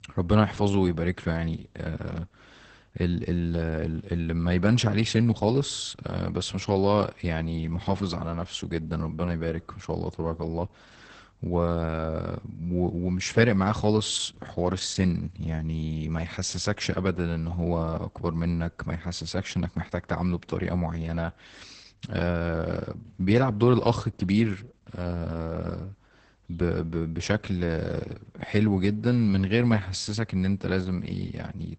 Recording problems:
garbled, watery; badly; nothing above 8 kHz

